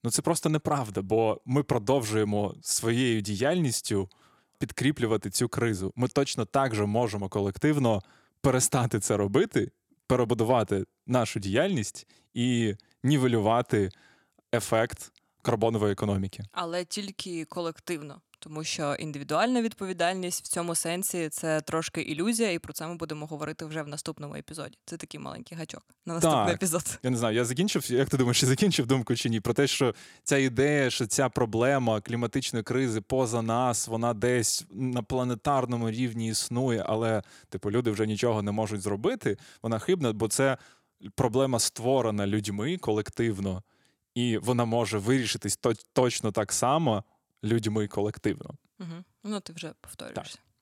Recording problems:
none

